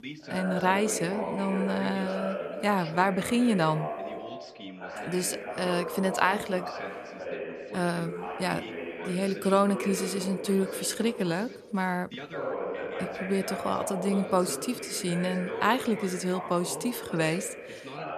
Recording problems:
background chatter; loud; throughout; 2 voices, 7 dB below the speech

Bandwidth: 13.5 kHz